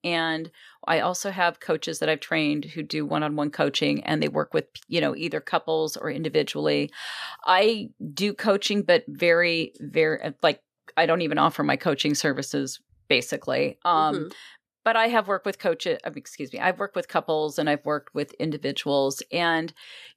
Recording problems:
none

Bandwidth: 14.5 kHz